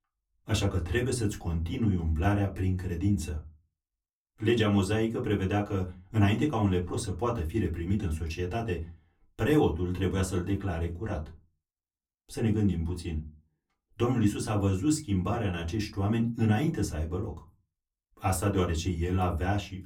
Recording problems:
off-mic speech; far
room echo; very slight; dies away in 0.2 s

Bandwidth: 17.5 kHz